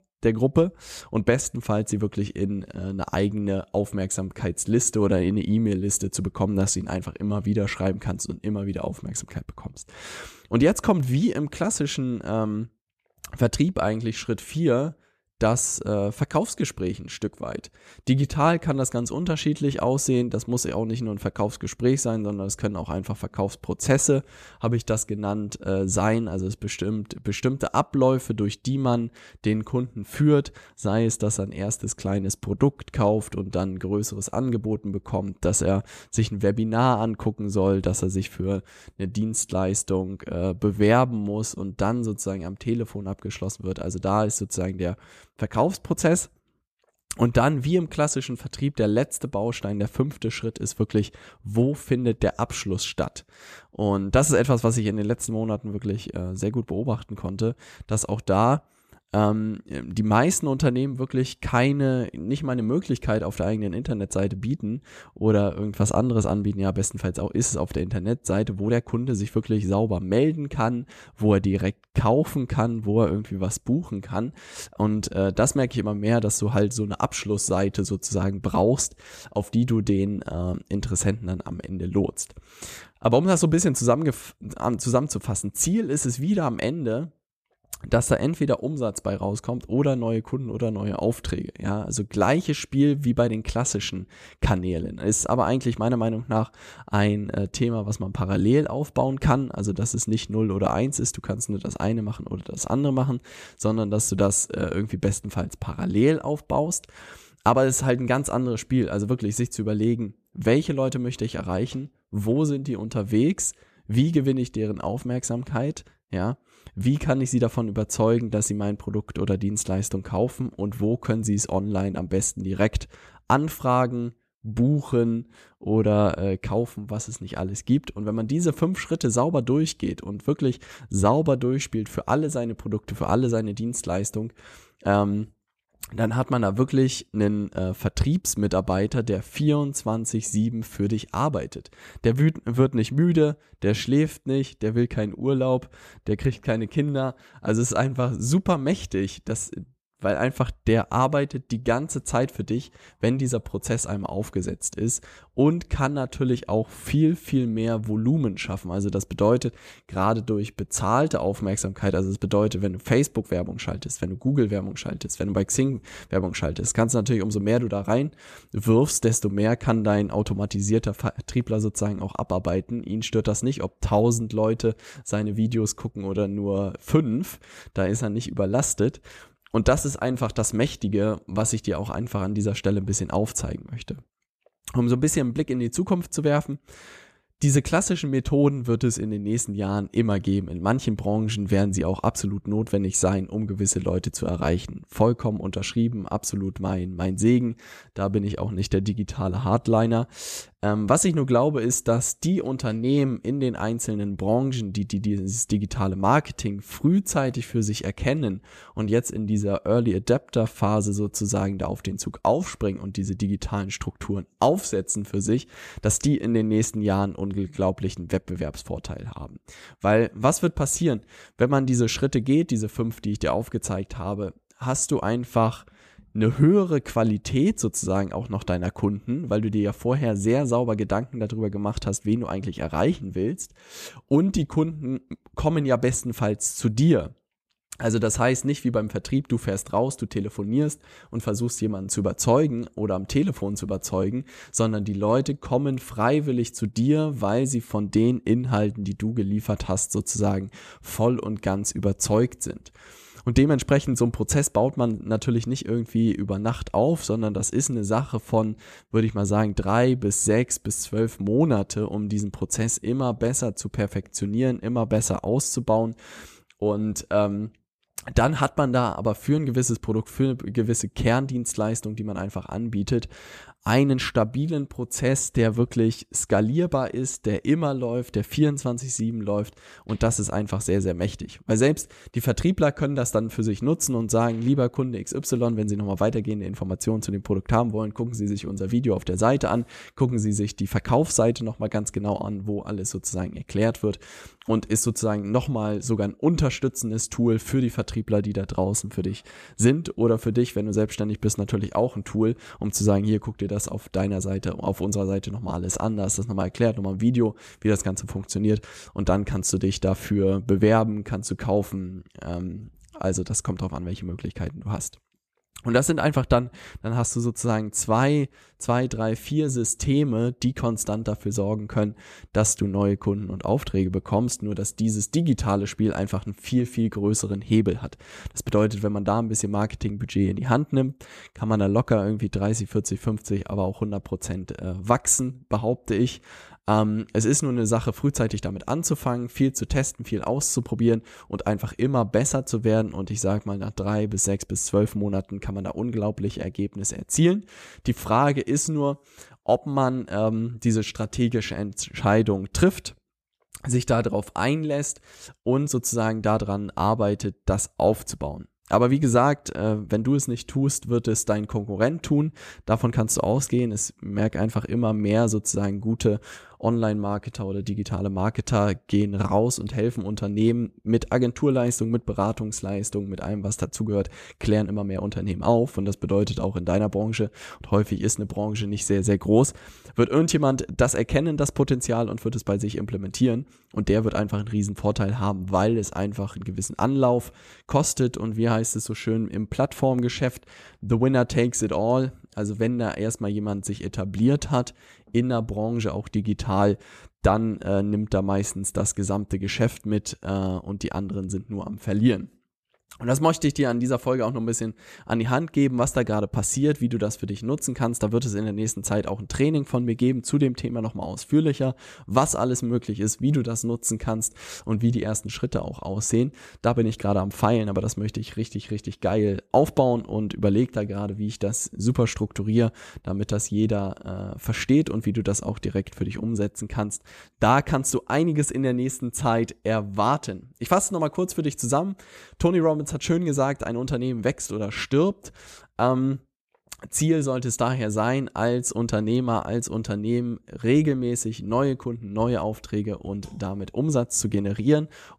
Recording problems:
none

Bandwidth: 14.5 kHz